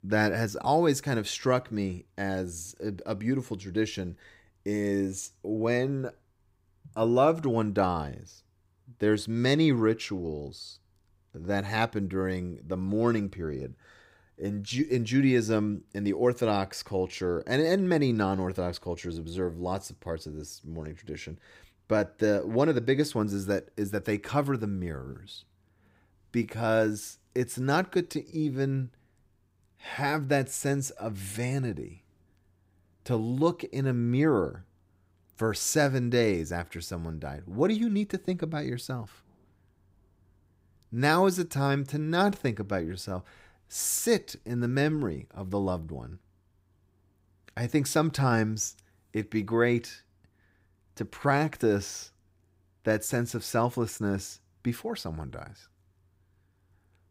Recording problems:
none

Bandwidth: 15.5 kHz